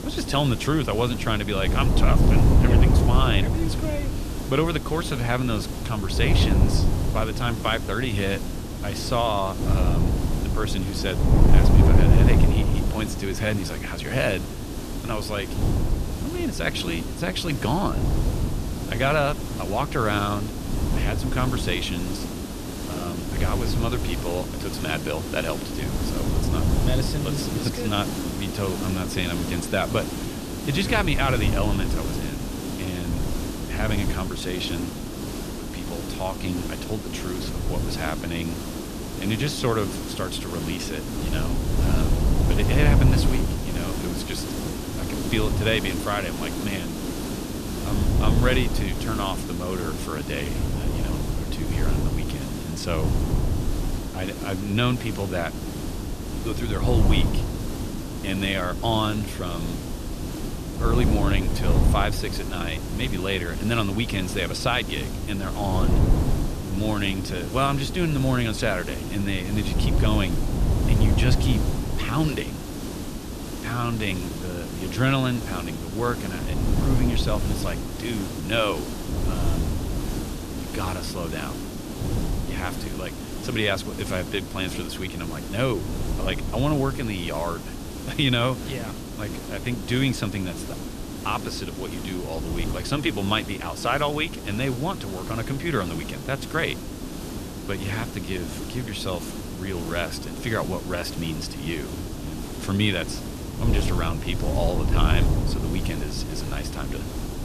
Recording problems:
wind noise on the microphone; heavy; 8 dB below the speech
hiss; loud; throughout; 6 dB below the speech

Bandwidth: 14.5 kHz